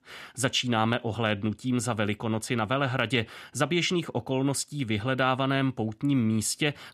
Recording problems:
none

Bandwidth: 14.5 kHz